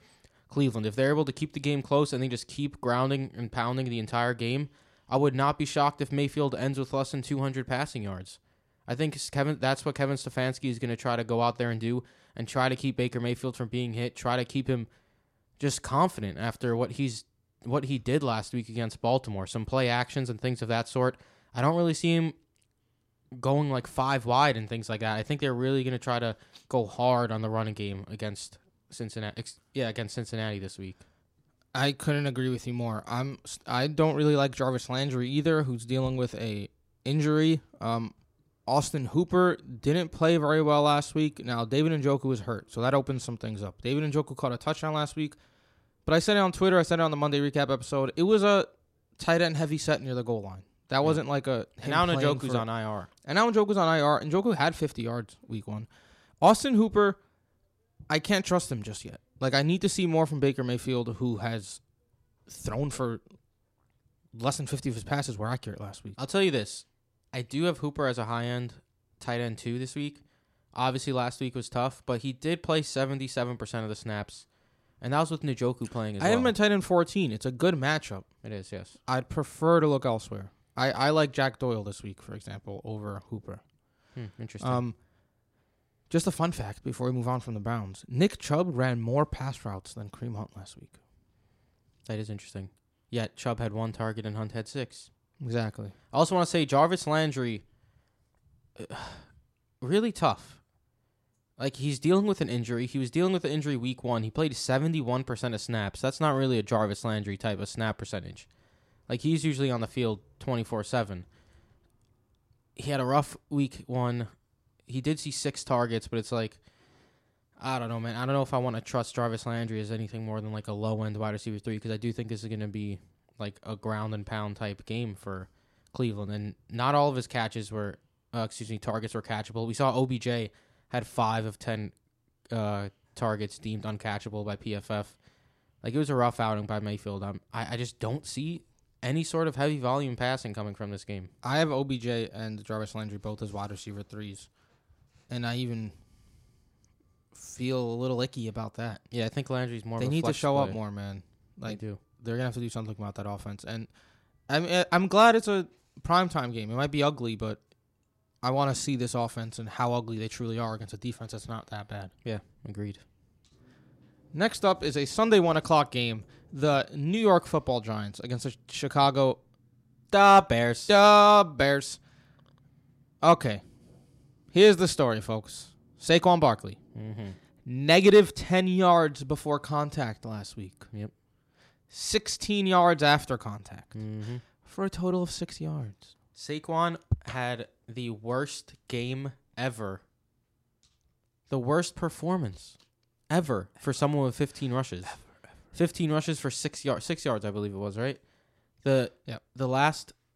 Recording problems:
none

